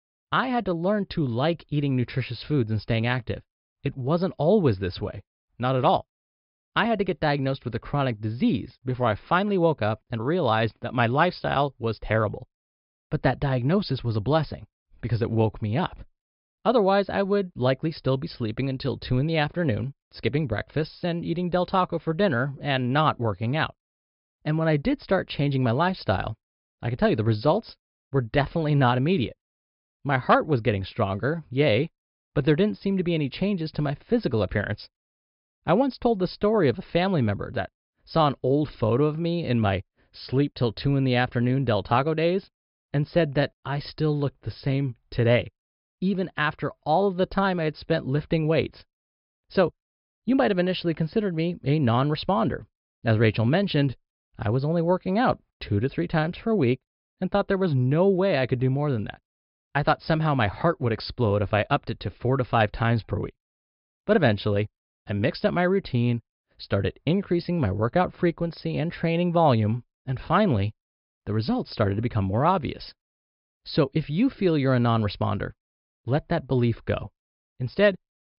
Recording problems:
high frequencies cut off; noticeable; nothing above 5.5 kHz

